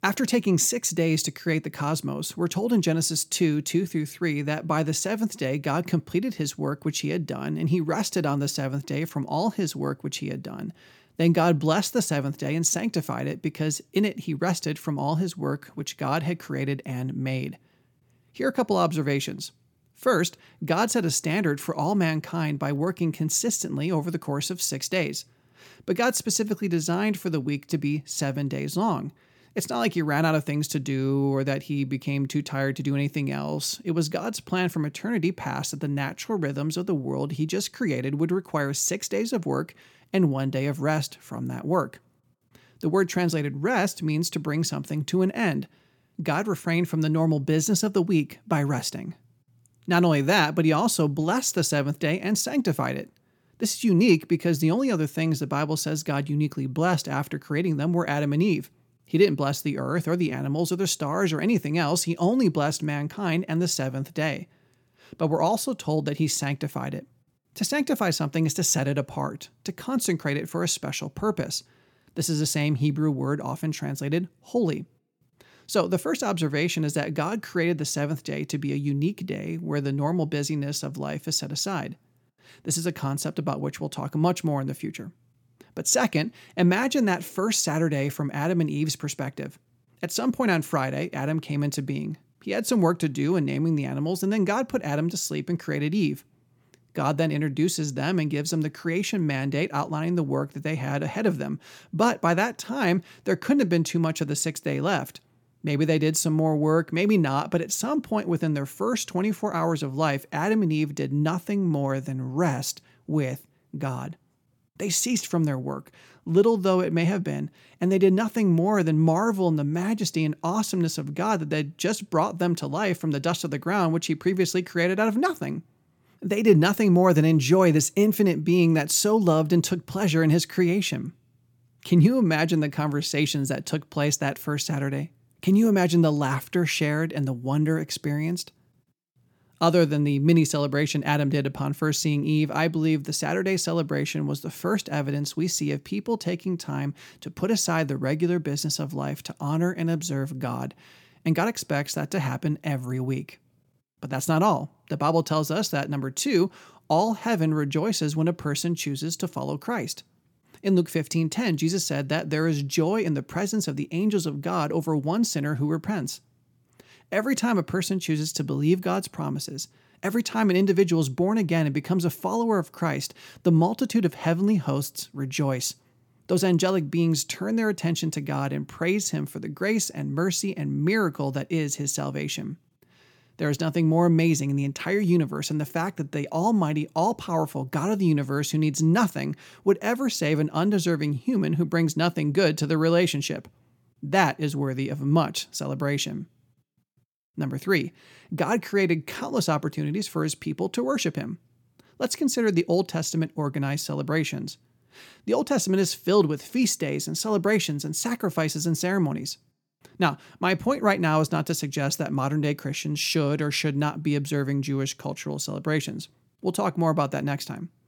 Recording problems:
none

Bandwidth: 18 kHz